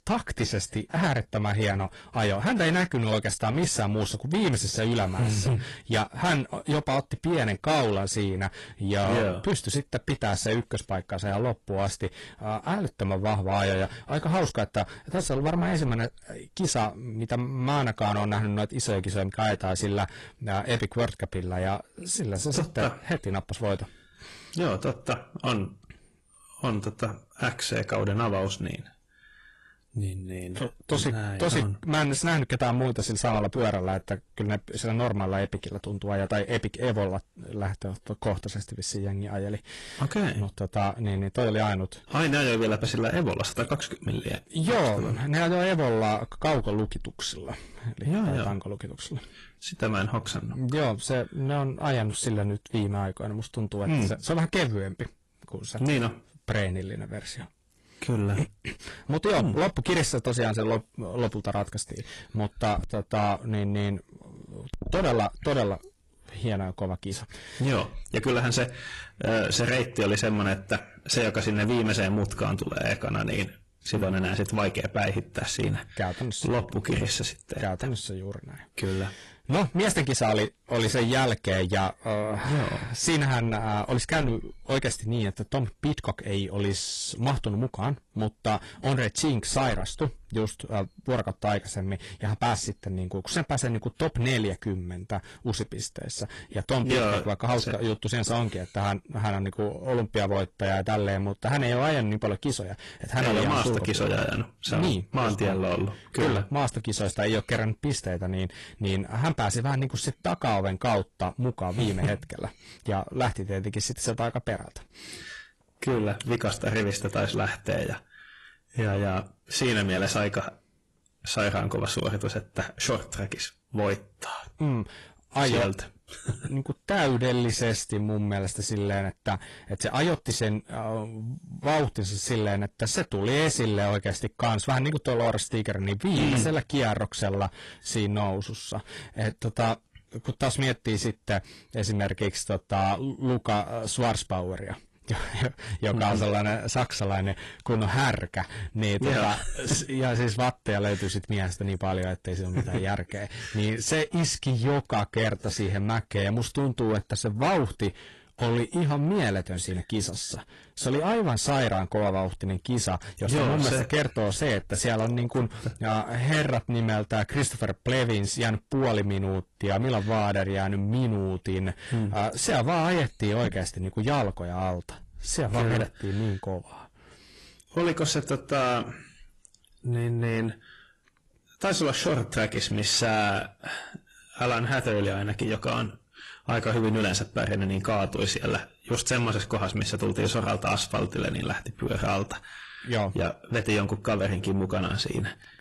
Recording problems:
distortion; heavy; 8 dB below the speech
garbled, watery; slightly

